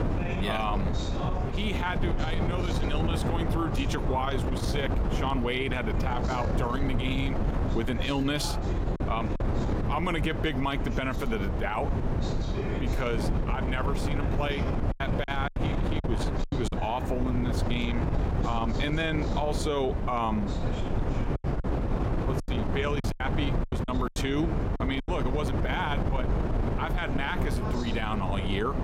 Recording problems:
squashed, flat; somewhat
wind noise on the microphone; heavy; 5 dB below the speech
chatter from many people; noticeable; throughout; 15 dB below the speech
choppy; very; from 15 to 17 s and from 22 to 25 s; 12% of the speech affected

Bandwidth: 16.5 kHz